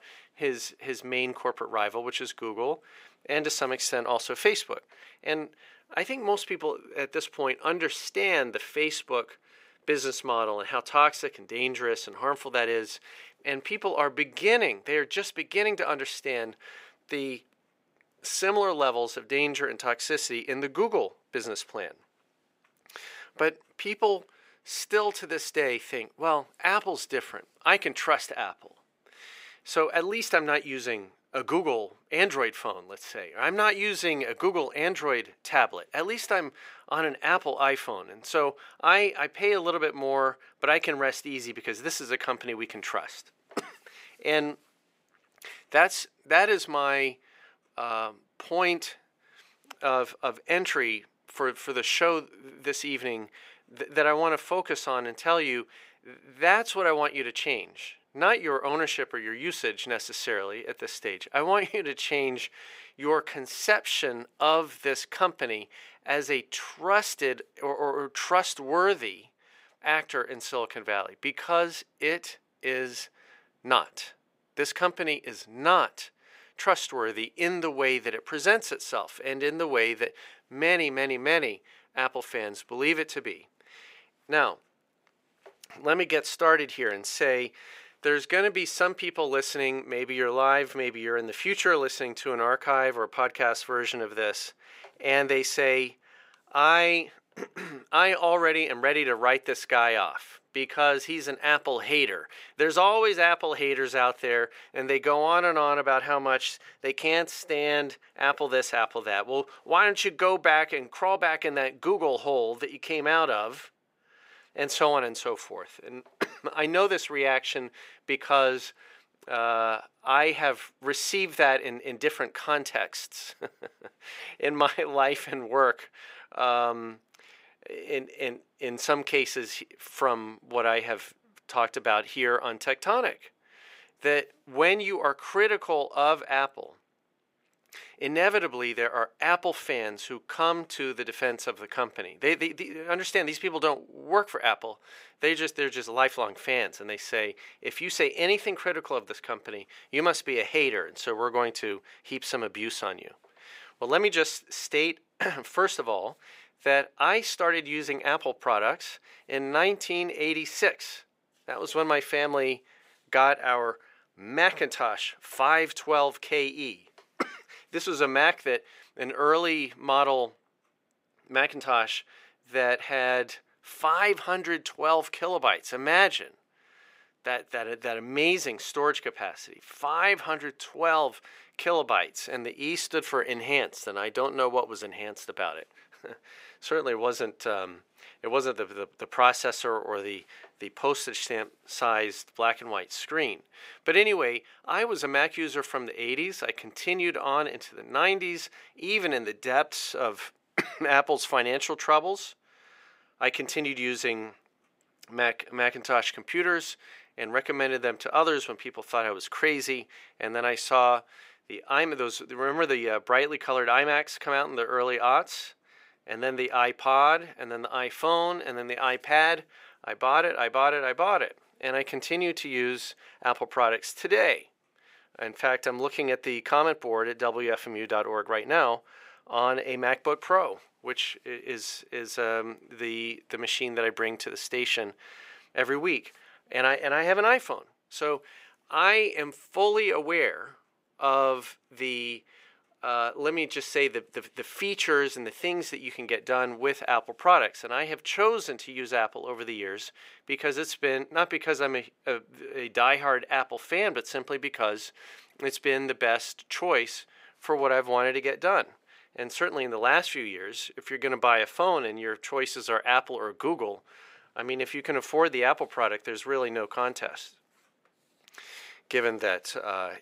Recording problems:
thin; somewhat; fading below 450 Hz

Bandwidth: 15.5 kHz